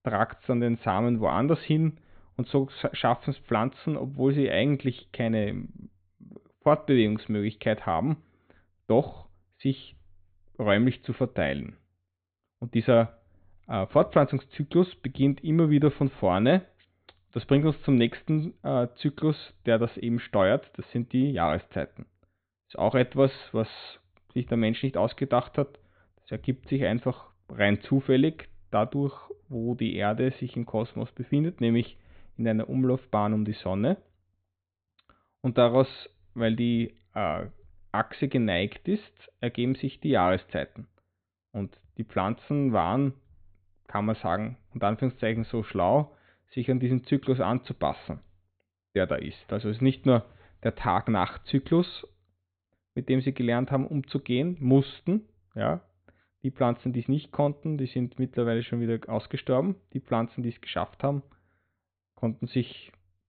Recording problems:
high frequencies cut off; severe; nothing above 4 kHz

